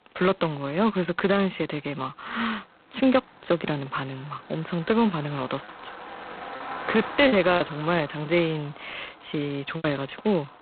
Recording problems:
phone-call audio; poor line; nothing above 4 kHz
traffic noise; noticeable; throughout; 15 dB below the speech
choppy; occasionally; 3% of the speech affected

